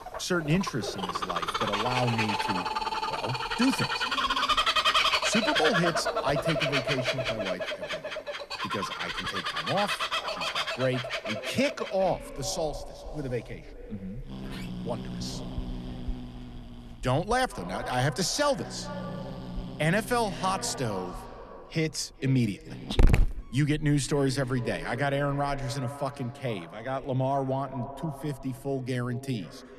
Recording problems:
echo of what is said; noticeable; throughout; 420 ms later, 15 dB below the speech
animal sounds; very loud; throughout; 1 dB above the speech
door banging; faint; from 14 to 17 s; peak 15 dB below the speech

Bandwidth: 13.5 kHz